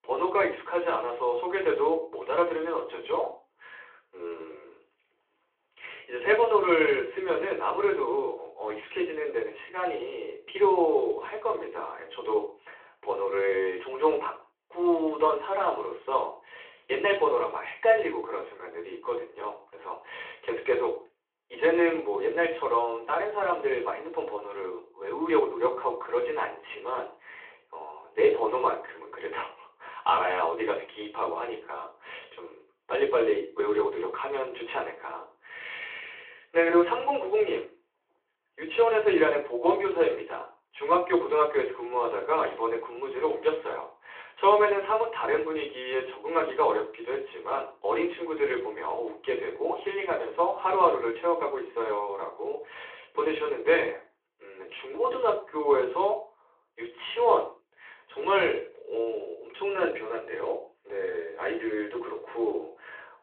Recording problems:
off-mic speech; far
room echo; slight; dies away in 0.3 s
phone-call audio

